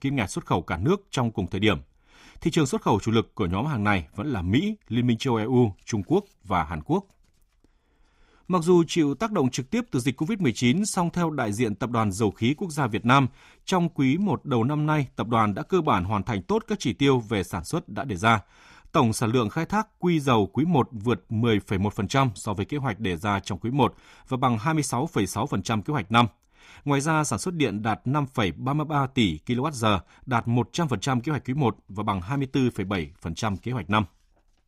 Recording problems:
none

